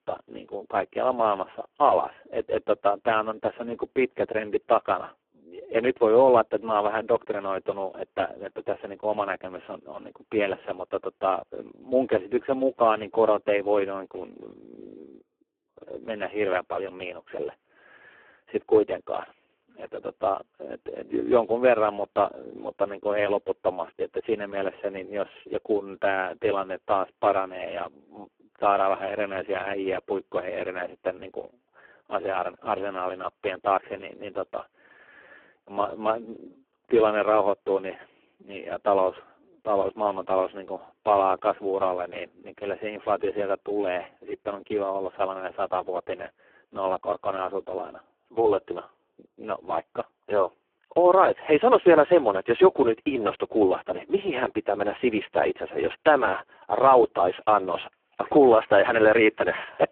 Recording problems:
phone-call audio; poor line

